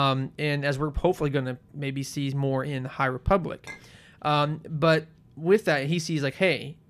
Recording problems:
abrupt cut into speech; at the start
clattering dishes; faint; at 3.5 s; peak 15 dB below the speech

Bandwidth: 14.5 kHz